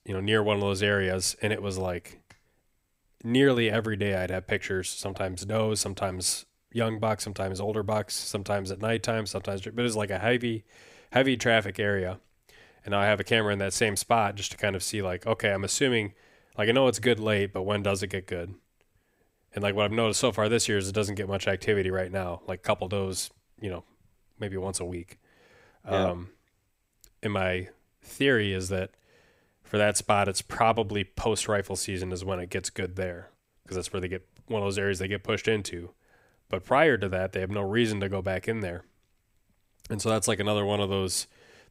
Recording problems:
none

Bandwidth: 15.5 kHz